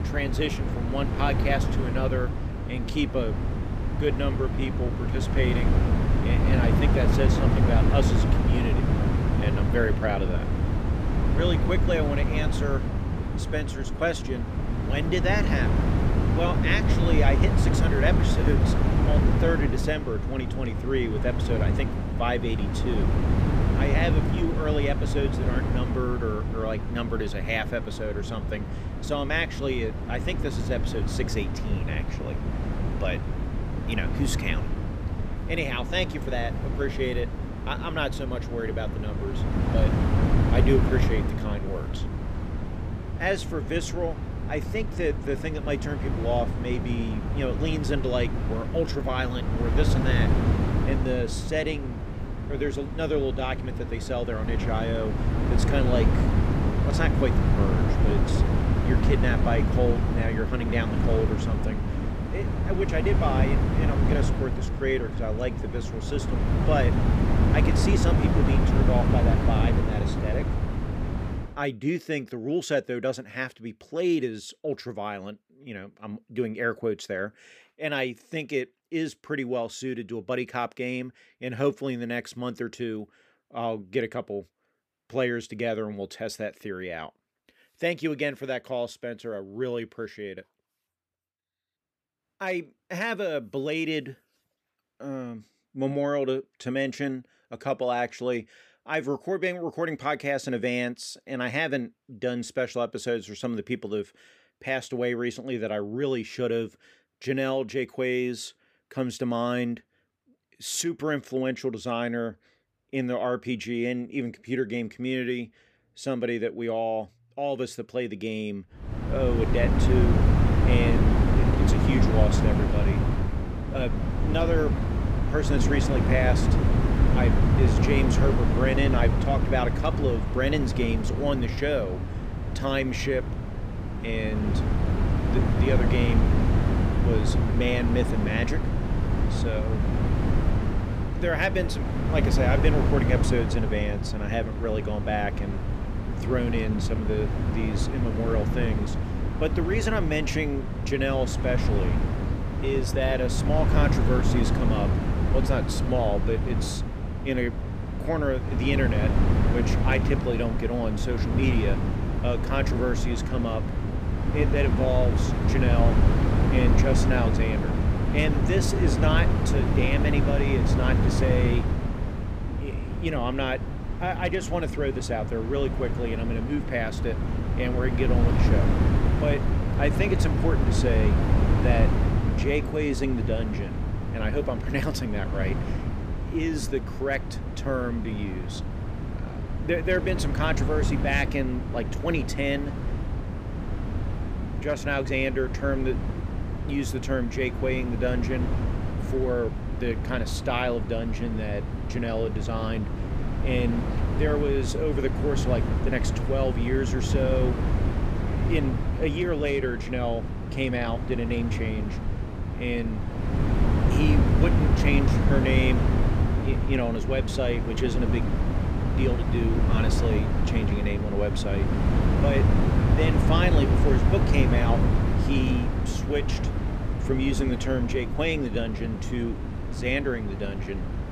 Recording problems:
wind noise on the microphone; heavy; until 1:11 and from 1:59 on; 4 dB below the speech

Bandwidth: 14.5 kHz